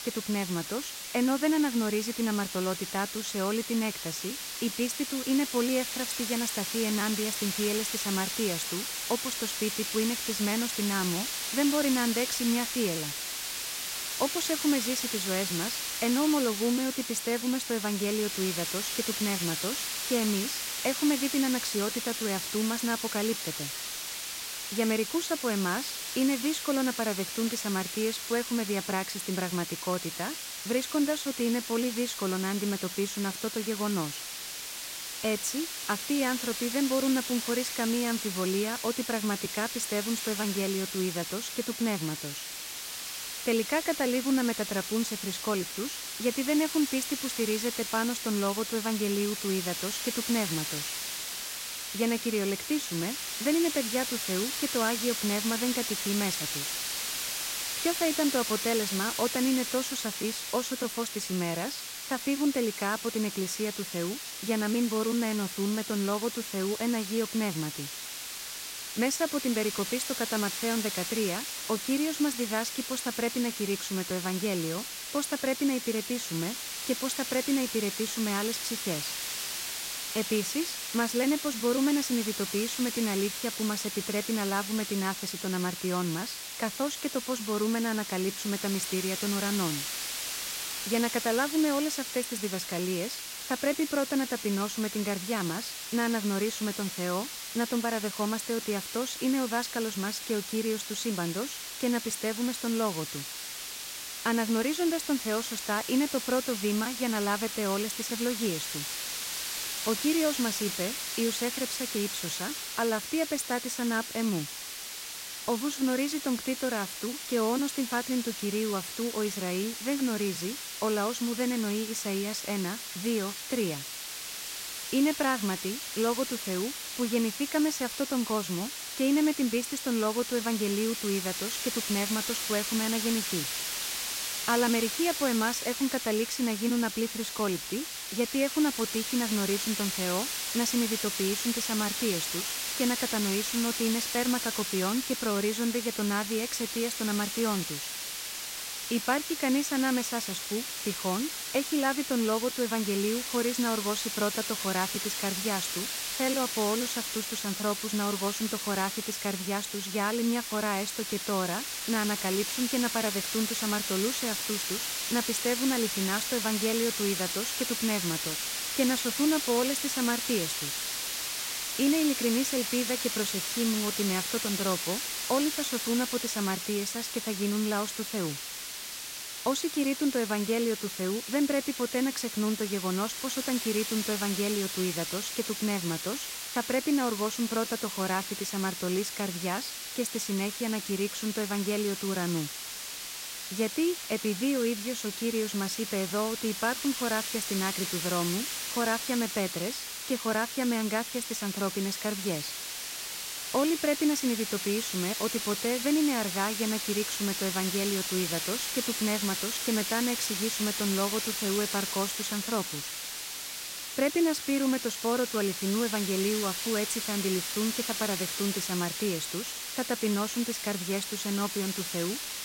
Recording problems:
hiss; loud; throughout; 2 dB below the speech

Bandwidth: 16 kHz